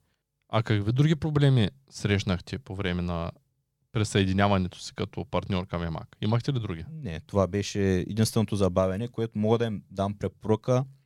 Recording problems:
none

